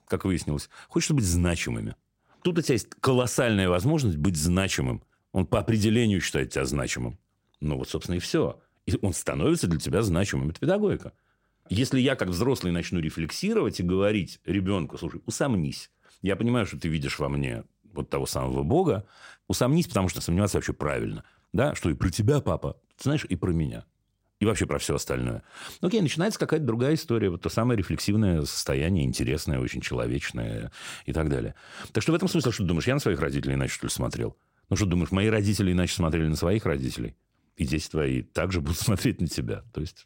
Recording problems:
none

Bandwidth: 16 kHz